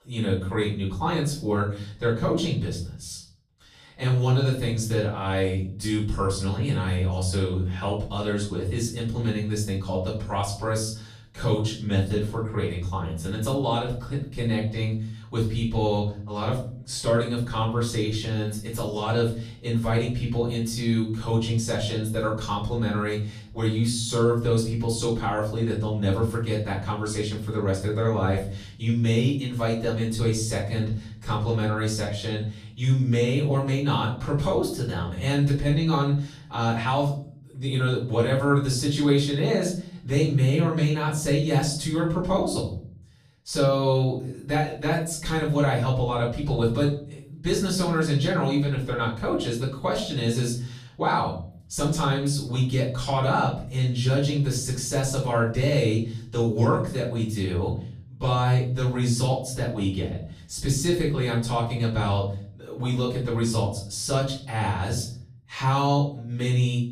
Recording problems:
off-mic speech; far
room echo; noticeable; dies away in 0.5 s

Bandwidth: 14.5 kHz